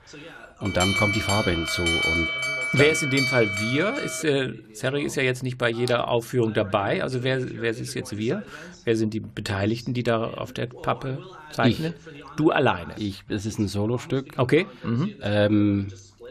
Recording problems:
voice in the background; noticeable; throughout; 20 dB below the speech
alarm; loud; from 0.5 to 4 s; peak 4 dB above the speech

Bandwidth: 15 kHz